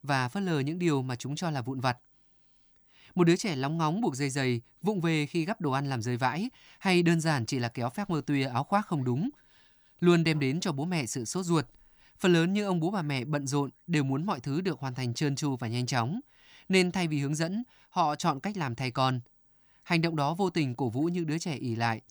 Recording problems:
none

